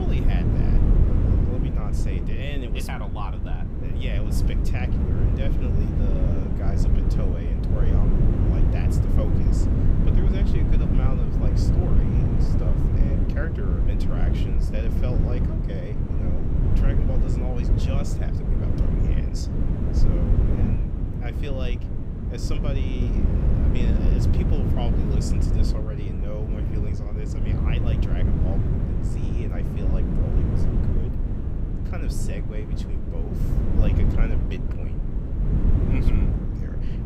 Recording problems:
wind noise on the microphone; heavy; 4 dB above the speech
abrupt cut into speech; at the start

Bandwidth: 15.5 kHz